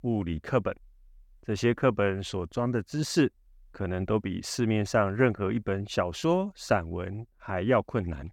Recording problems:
none

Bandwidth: 17.5 kHz